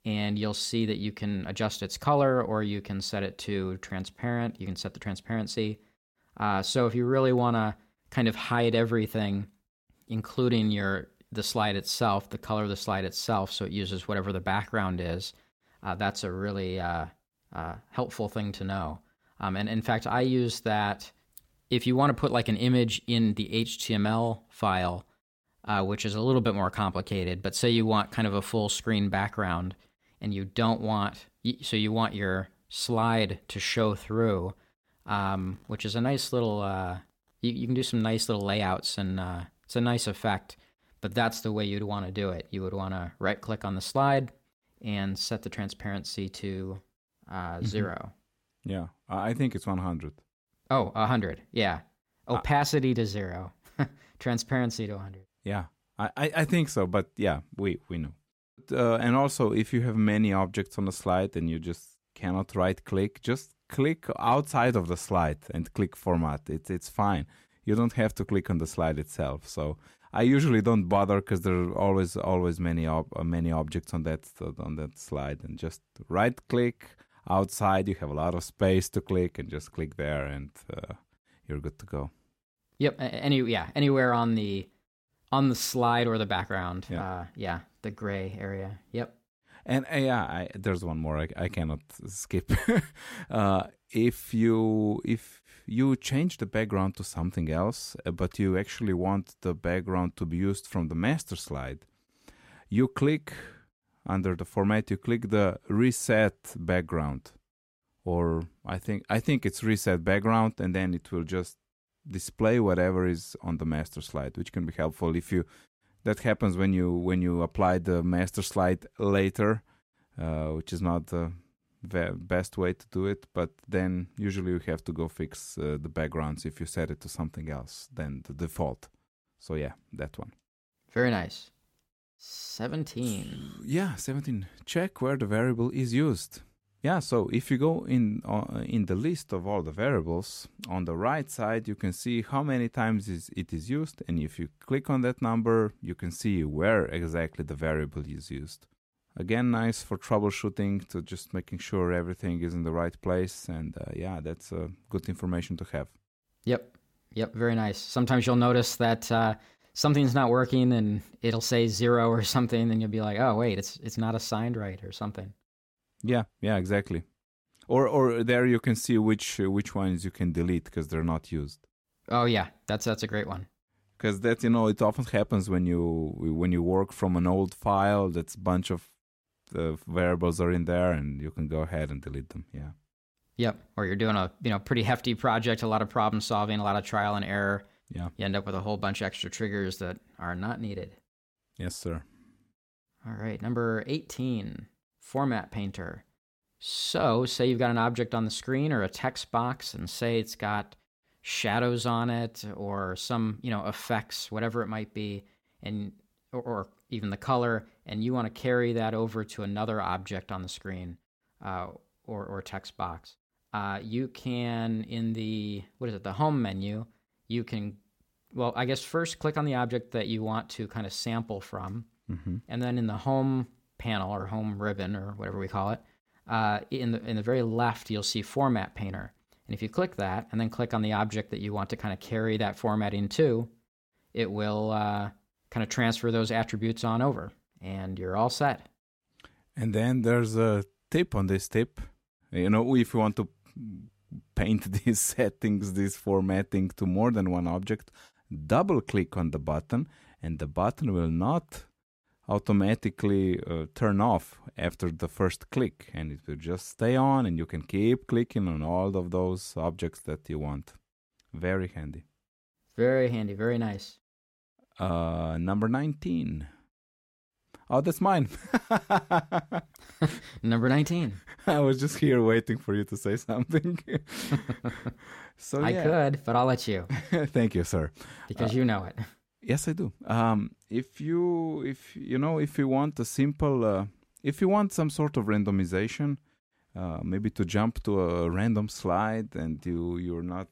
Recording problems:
none

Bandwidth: 16.5 kHz